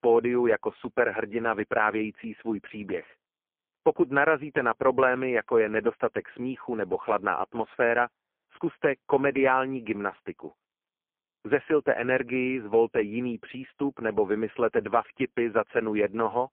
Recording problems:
phone-call audio; poor line

